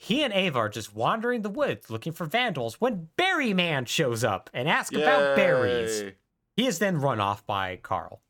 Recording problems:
none

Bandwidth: 17.5 kHz